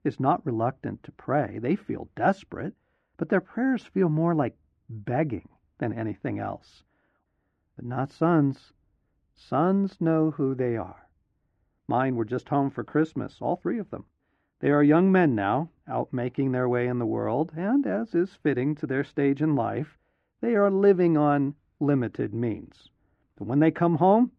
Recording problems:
muffled; very; fading above 2 kHz

